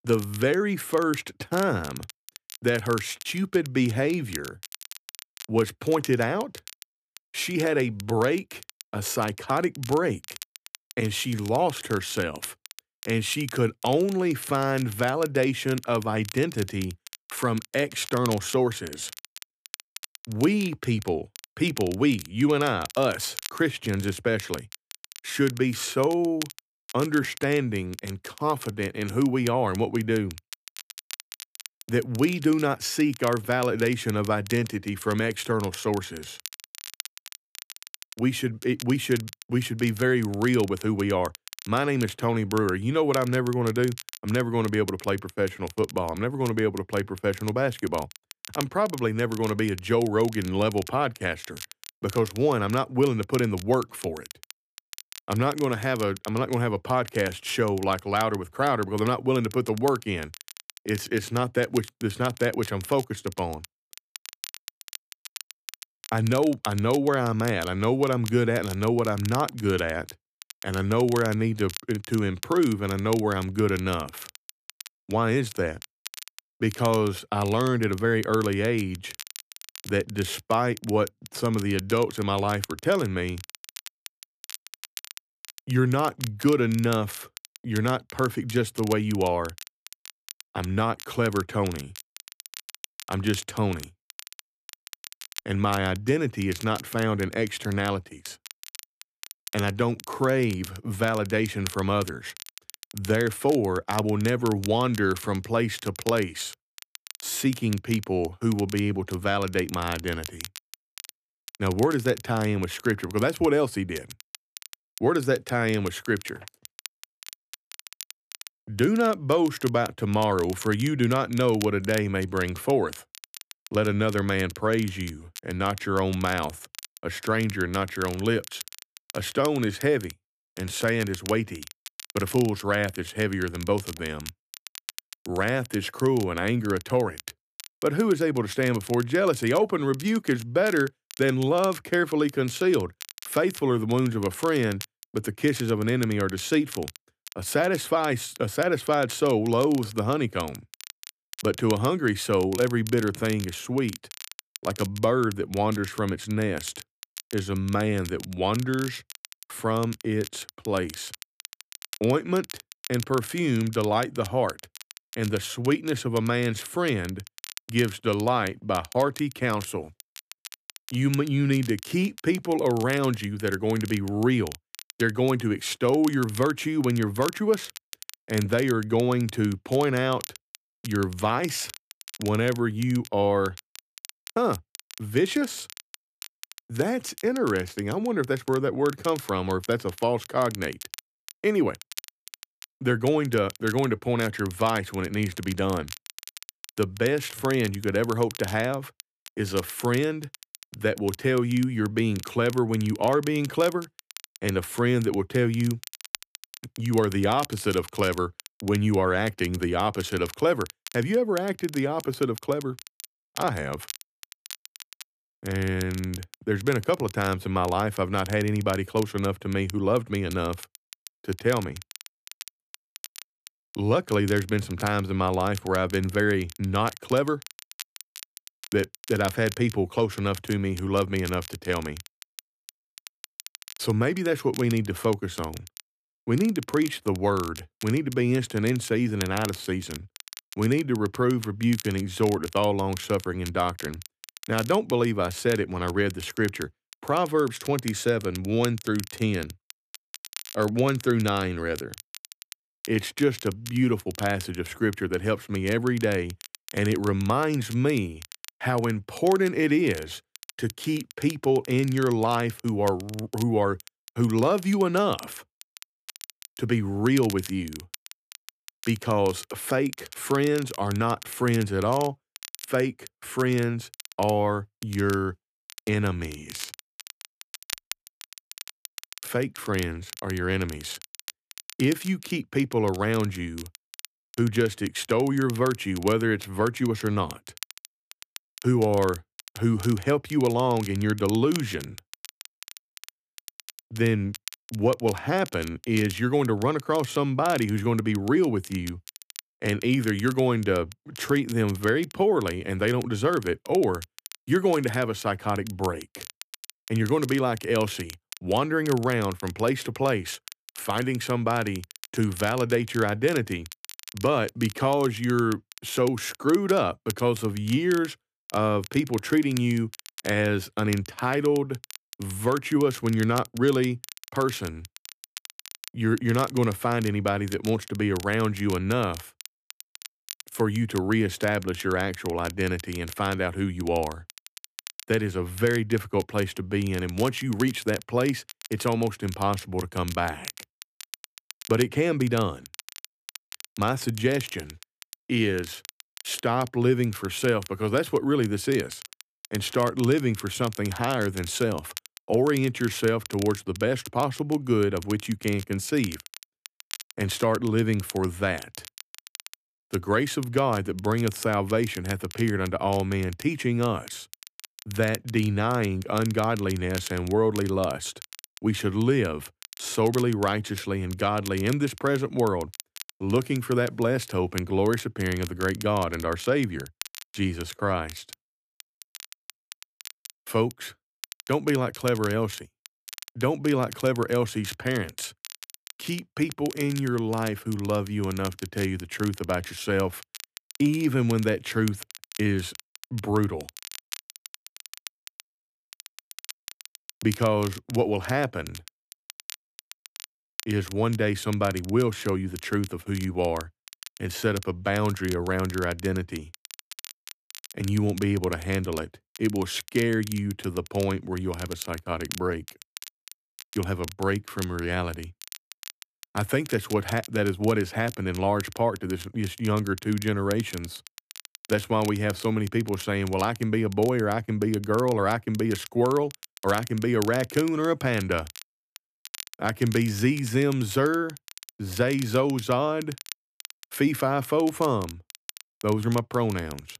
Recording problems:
crackle, like an old record; noticeable; 15 dB below the speech

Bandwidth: 14.5 kHz